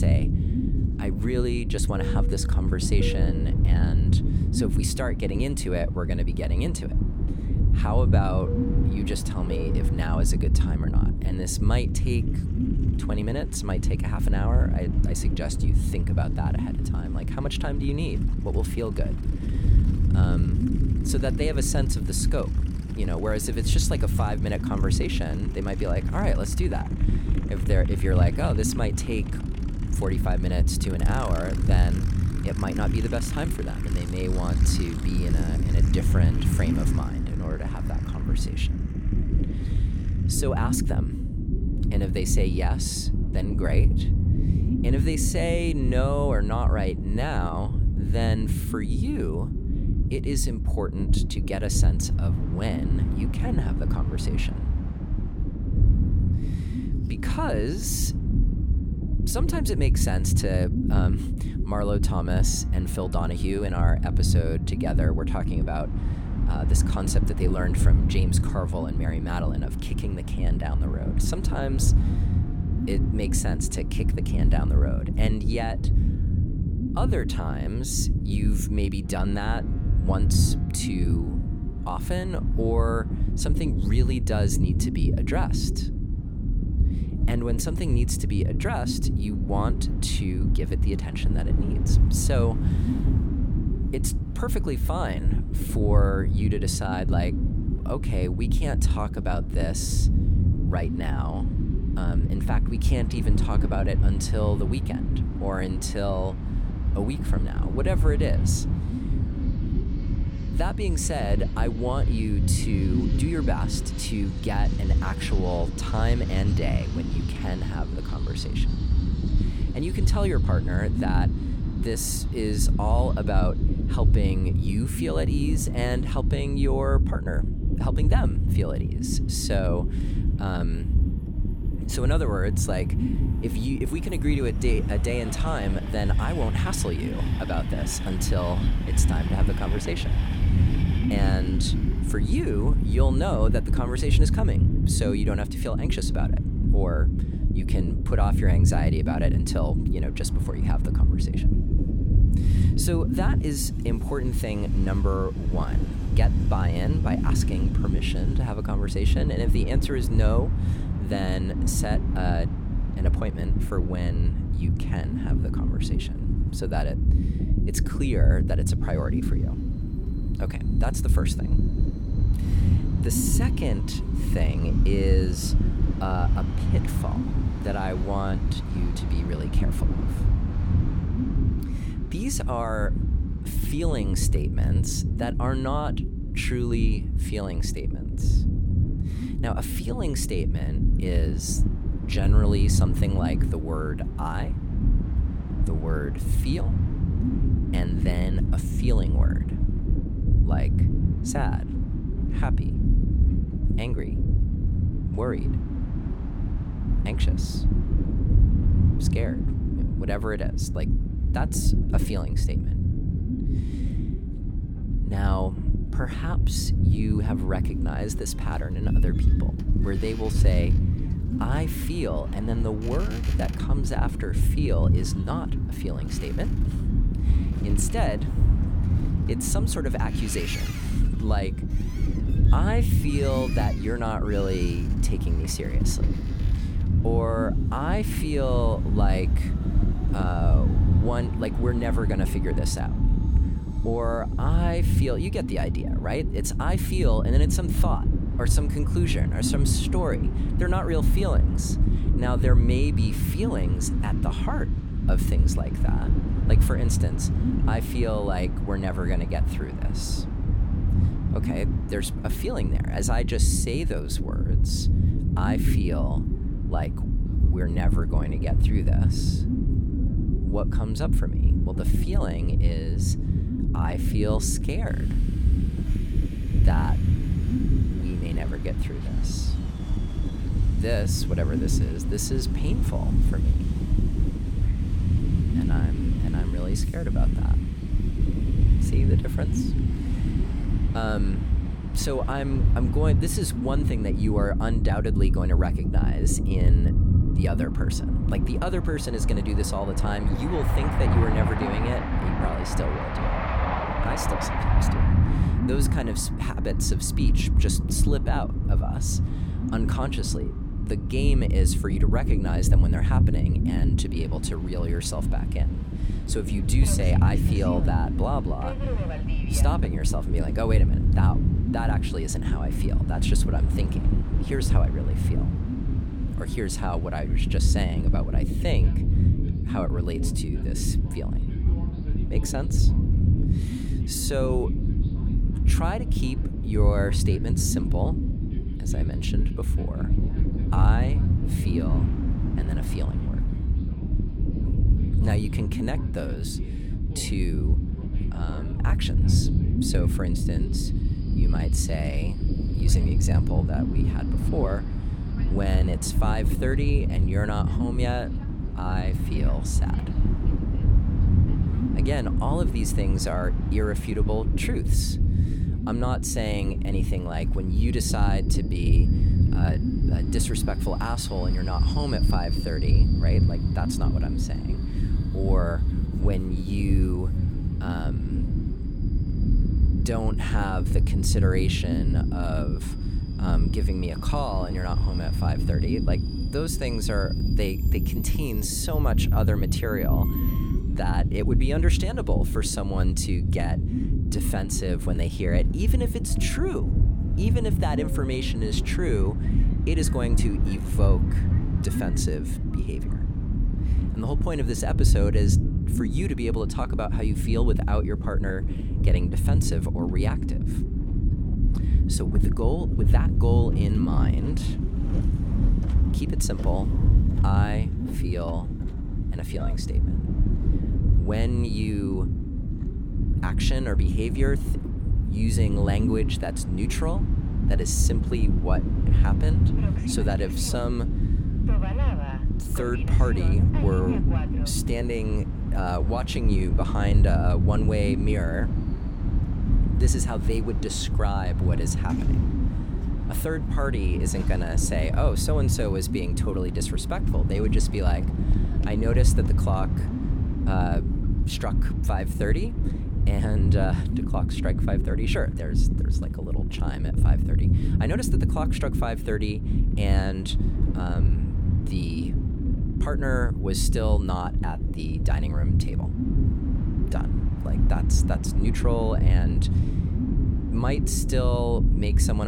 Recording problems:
low rumble; loud; throughout; 5 dB below the speech
train or aircraft noise; noticeable; throughout; 15 dB below the speech
abrupt cut into speech; at the start and the end

